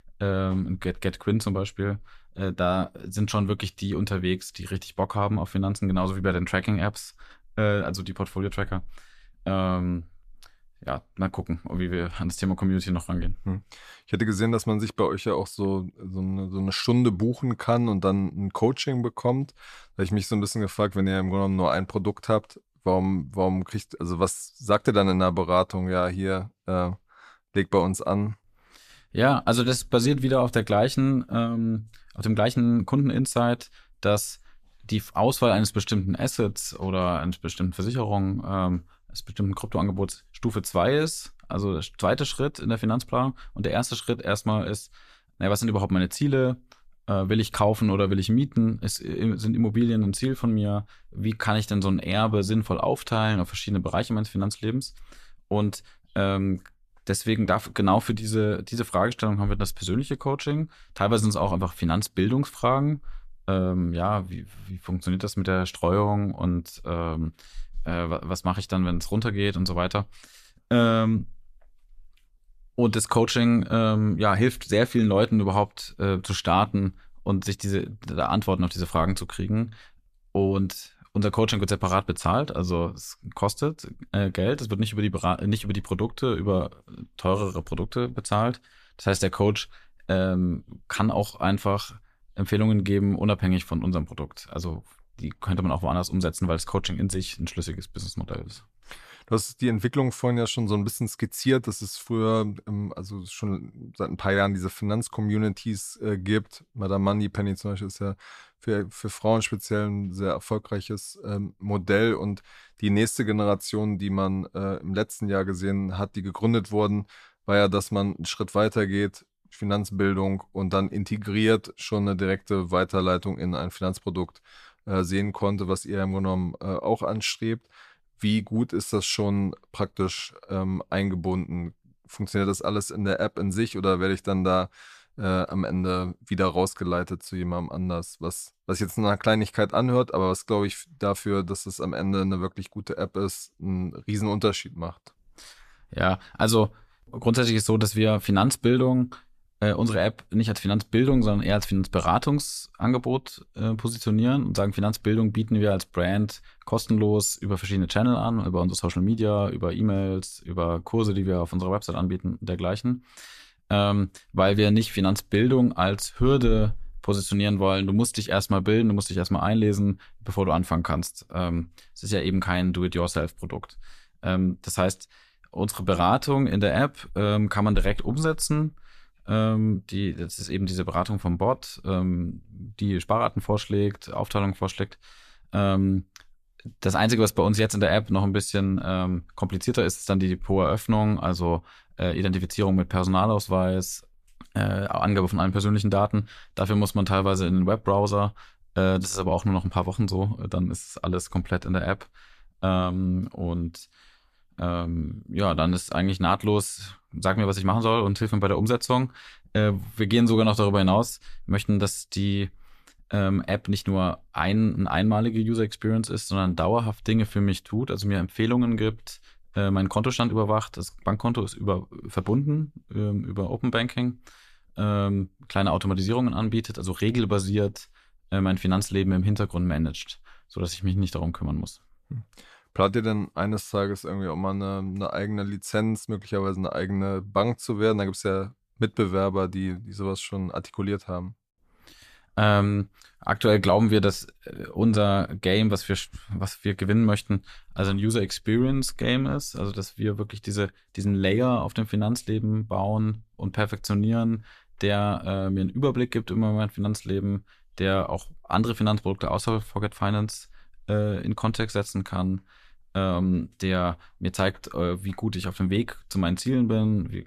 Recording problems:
none

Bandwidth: 14 kHz